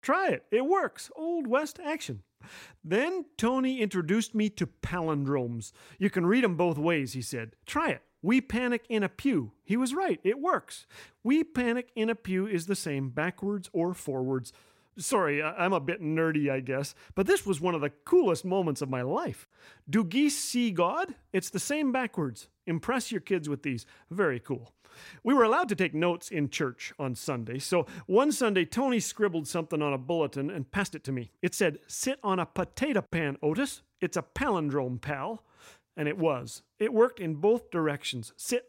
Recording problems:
uneven, jittery; strongly; from 2.5 to 32 s

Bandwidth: 16 kHz